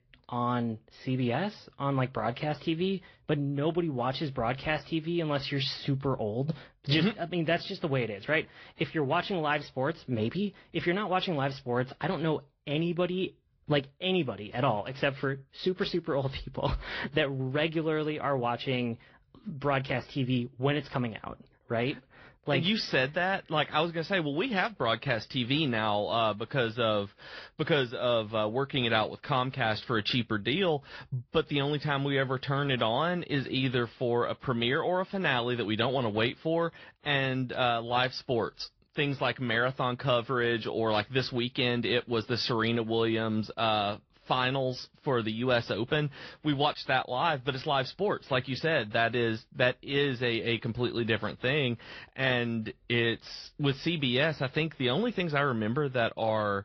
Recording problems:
high frequencies cut off; noticeable; nothing above 5.5 kHz
garbled, watery; slightly

